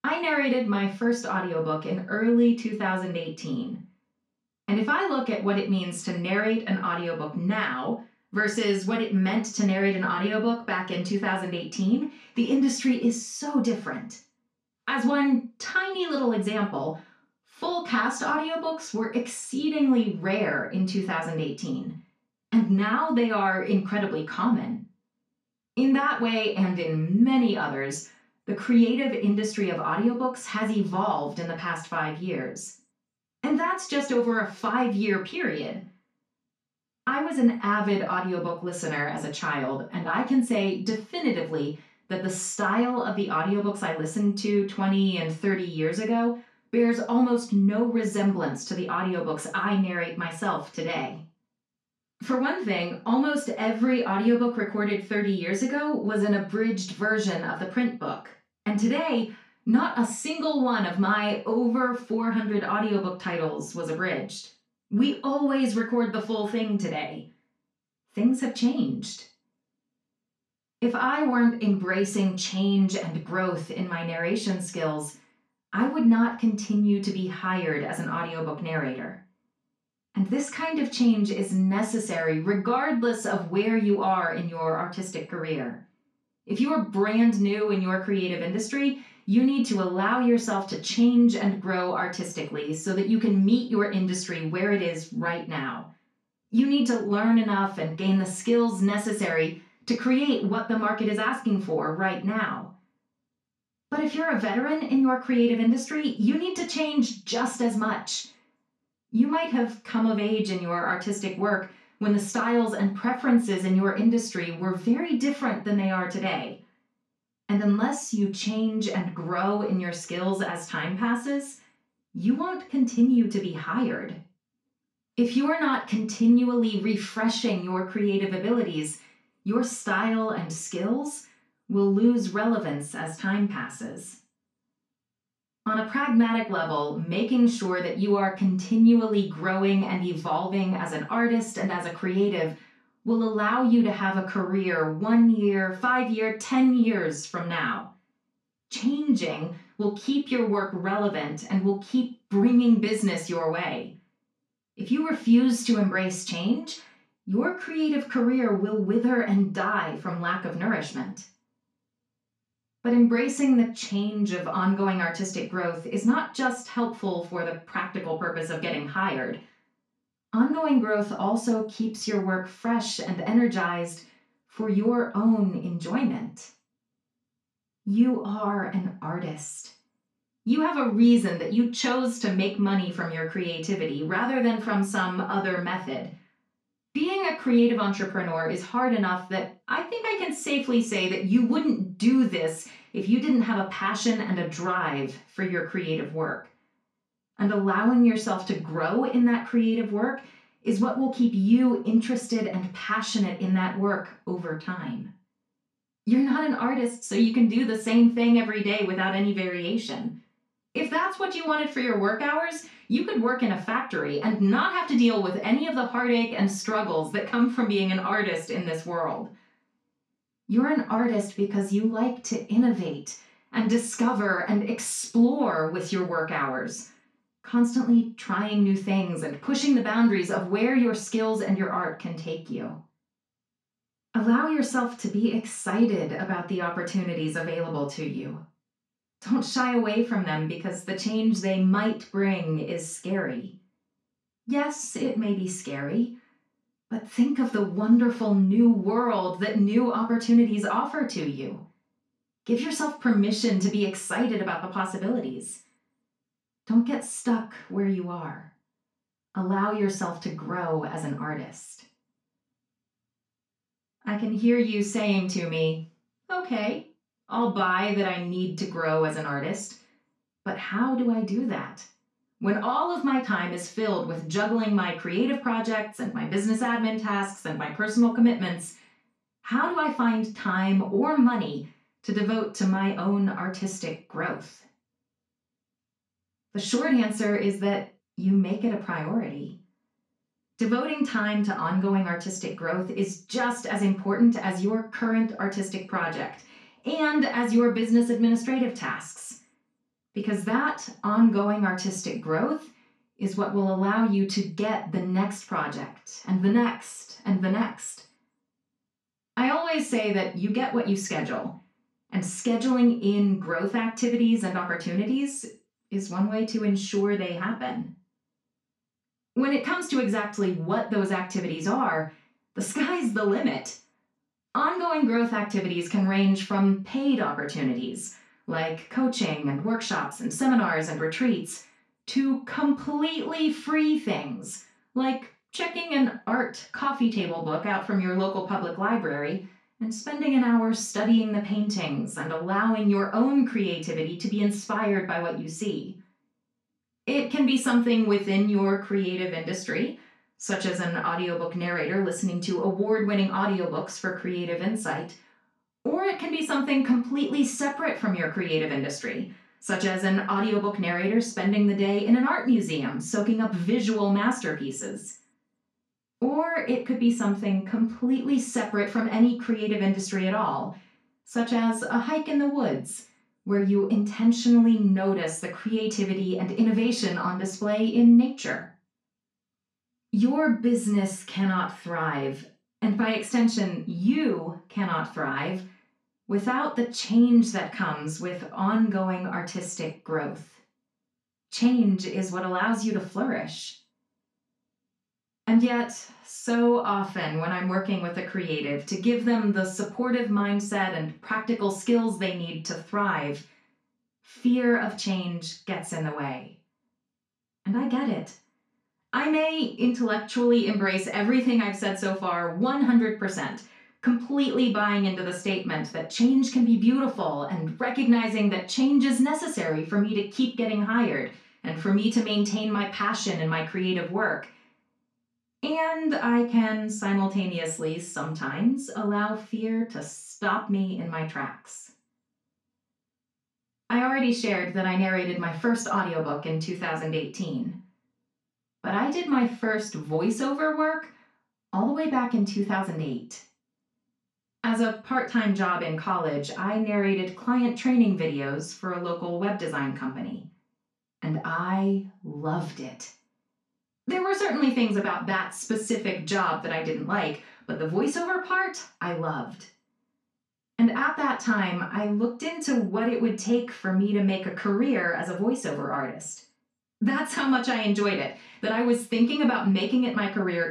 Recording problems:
off-mic speech; far
room echo; slight; dies away in 0.3 s

